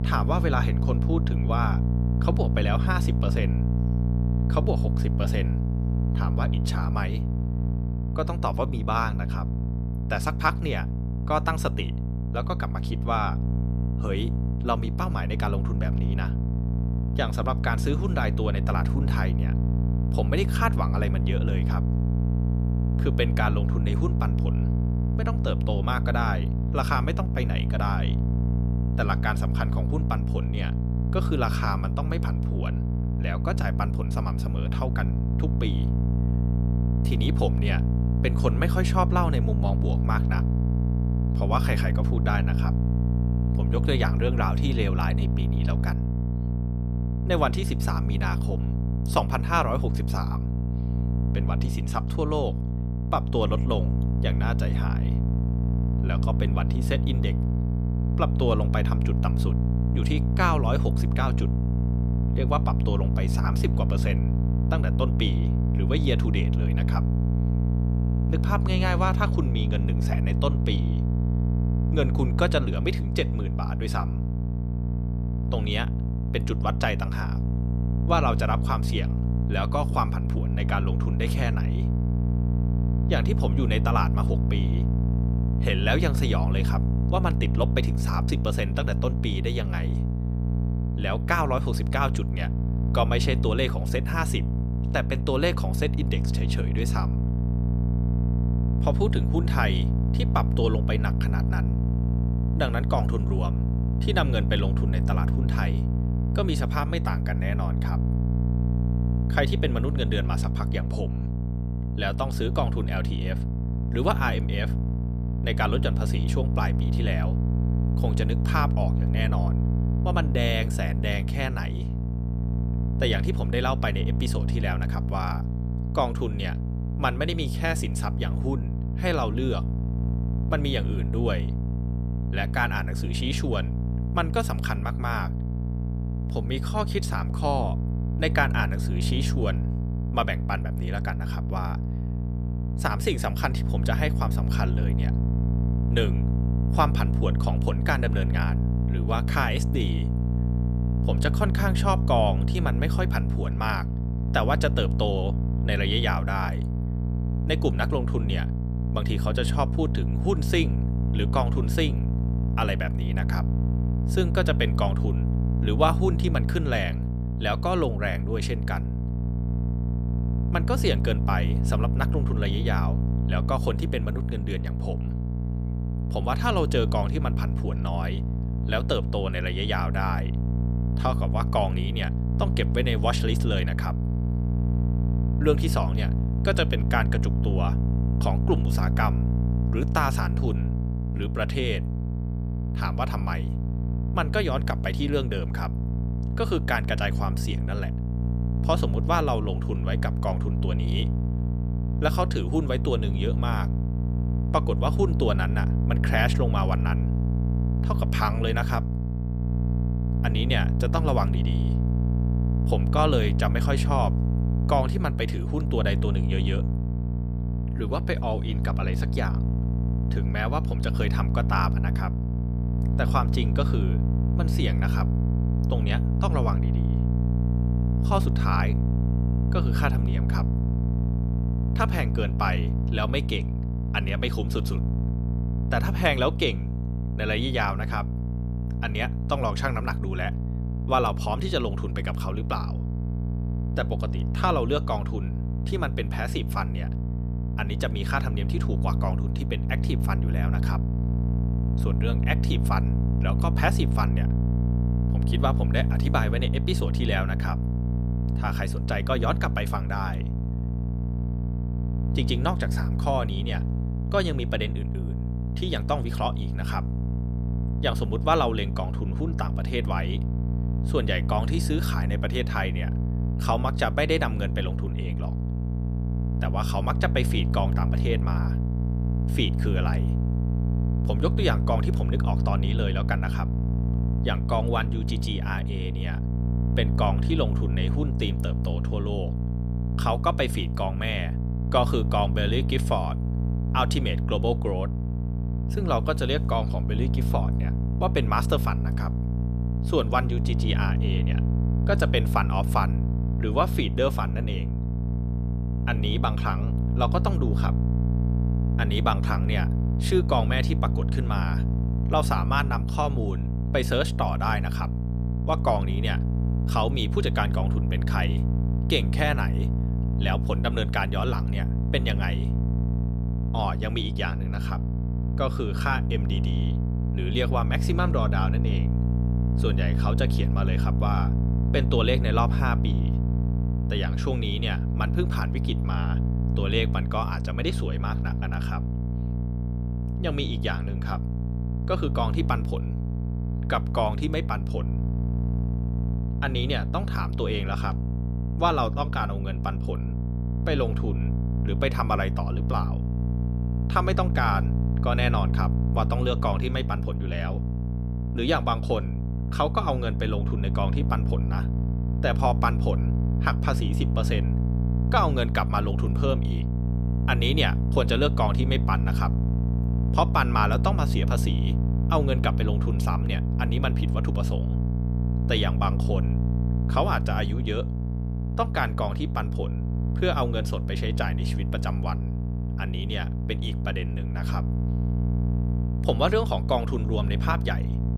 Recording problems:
electrical hum; loud; throughout; 60 Hz, 8 dB below the speech

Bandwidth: 14.5 kHz